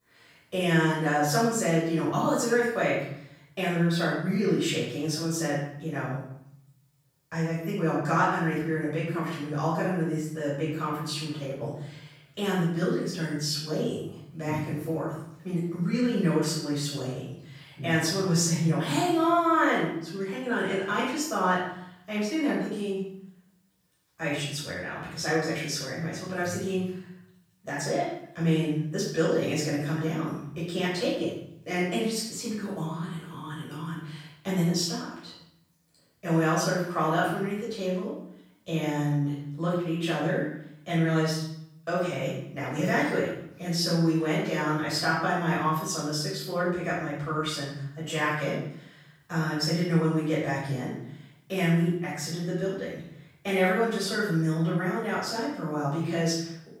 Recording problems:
off-mic speech; far
room echo; noticeable; dies away in 0.7 s

